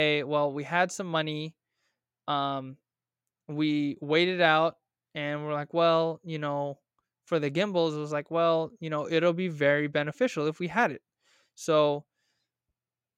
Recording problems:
abrupt cut into speech; at the start

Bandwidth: 16 kHz